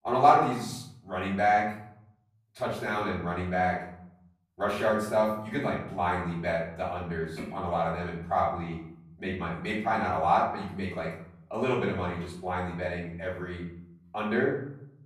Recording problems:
off-mic speech; far
room echo; noticeable; dies away in 0.7 s

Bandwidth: 14.5 kHz